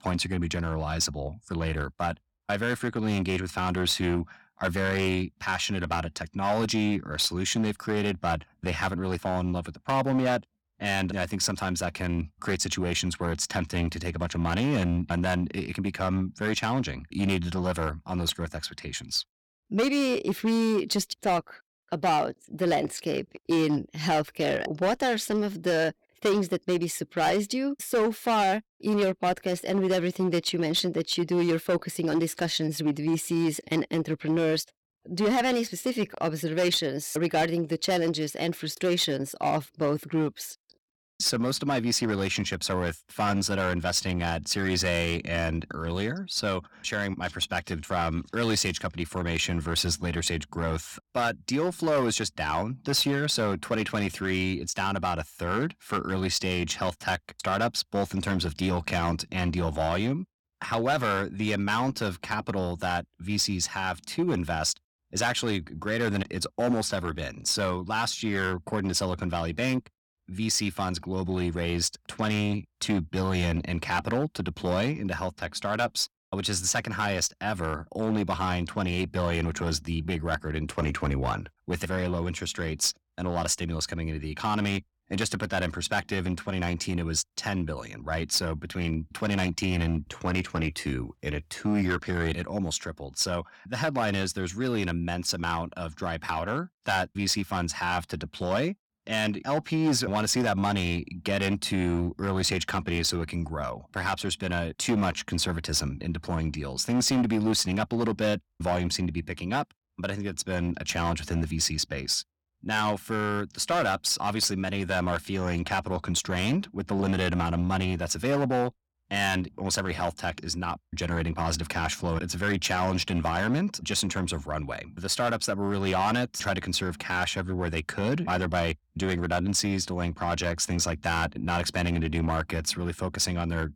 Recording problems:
distortion; slight; 6% of the sound clipped

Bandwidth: 17.5 kHz